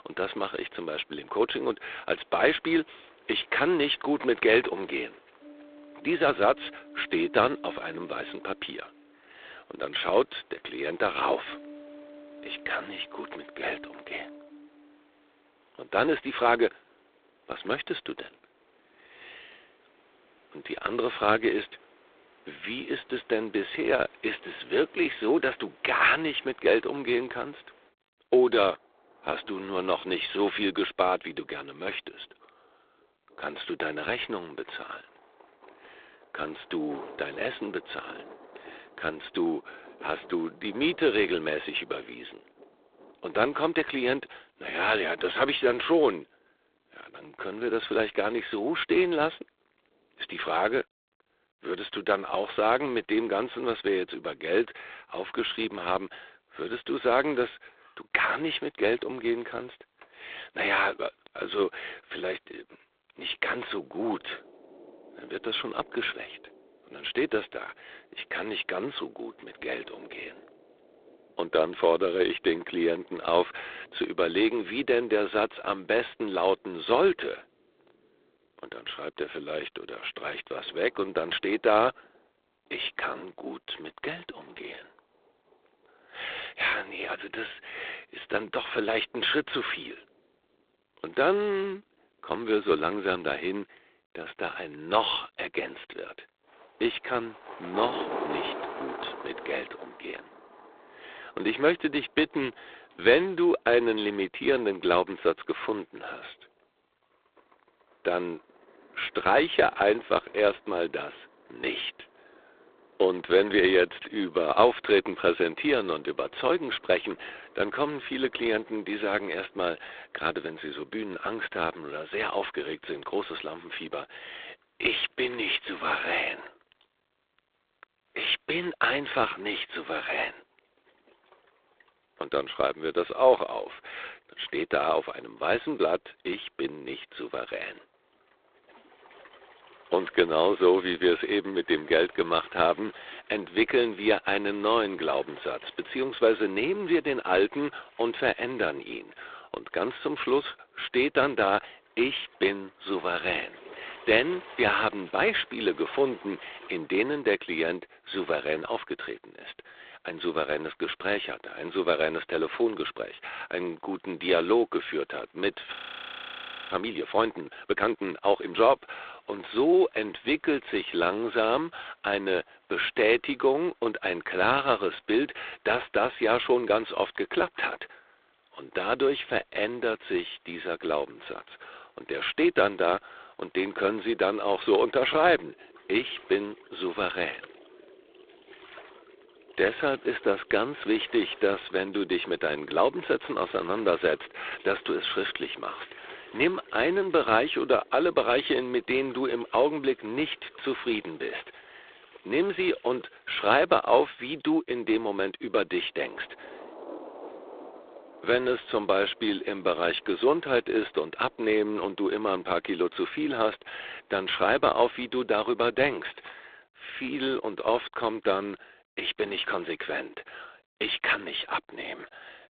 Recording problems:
phone-call audio; poor line; nothing above 3.5 kHz
rain or running water; faint; throughout; 20 dB below the speech
audio freezing; at 2:46 for 1 s

